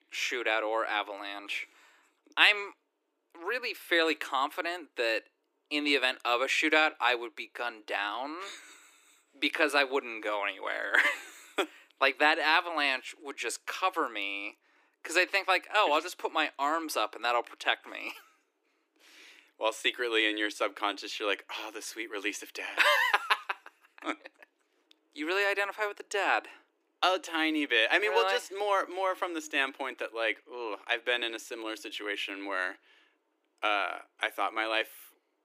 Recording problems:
thin; somewhat; fading below 300 Hz

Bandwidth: 15 kHz